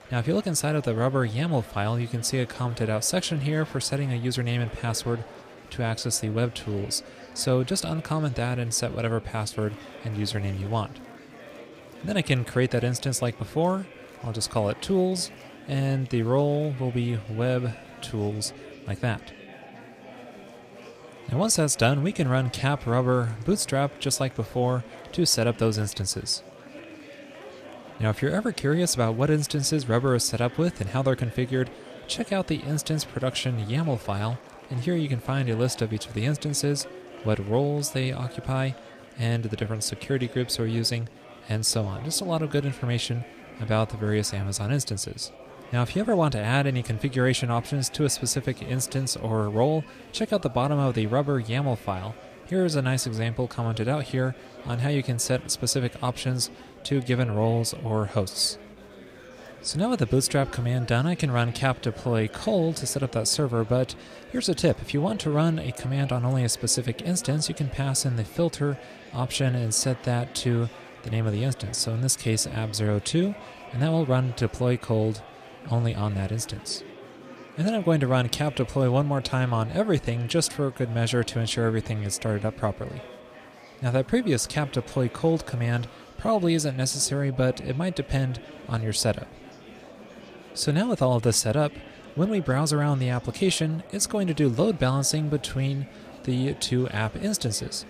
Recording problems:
murmuring crowd; noticeable; throughout; 20 dB below the speech

